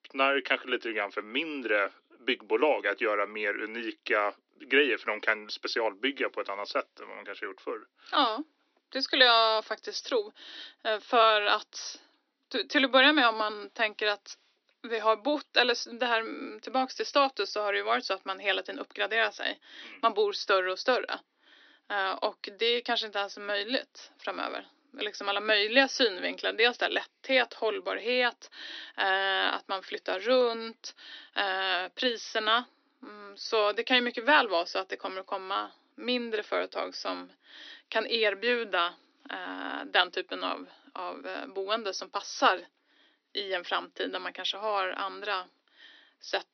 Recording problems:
thin; somewhat; fading below 250 Hz
high frequencies cut off; noticeable; nothing above 6 kHz

